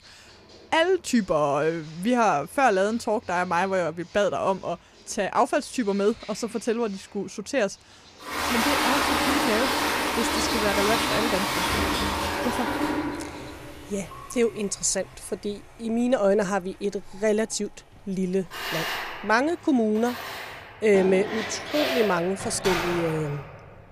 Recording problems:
household noises; loud; throughout; 1 dB below the speech
animal sounds; faint; from 8 s on; 25 dB below the speech

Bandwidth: 15 kHz